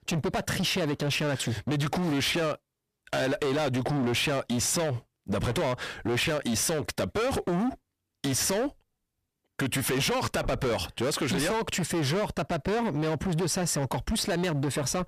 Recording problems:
distortion; heavy; 27% of the sound clipped

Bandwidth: 14.5 kHz